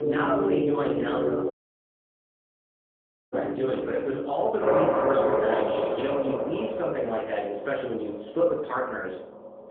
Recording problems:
phone-call audio; poor line
off-mic speech; far
room echo; noticeable; dies away in 0.5 s
background music; very loud; throughout; 2 dB above the speech
audio cutting out; at 1.5 s for 2 s

